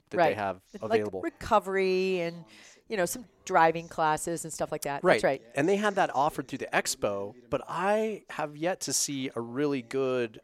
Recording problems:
voice in the background; faint; throughout; 30 dB below the speech

